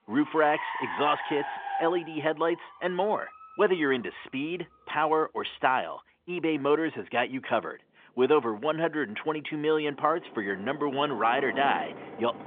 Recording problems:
phone-call audio; nothing above 3.5 kHz
traffic noise; noticeable; throughout; 10 dB below the speech

